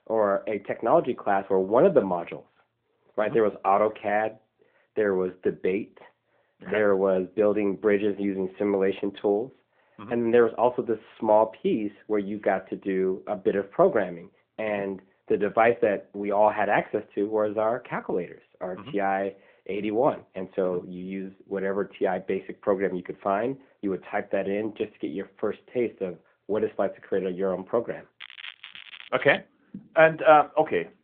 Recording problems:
muffled; very; fading above 1.5 kHz
phone-call audio
crackling; noticeable; from 28 to 29 s, mostly in the pauses; 15 dB below the speech

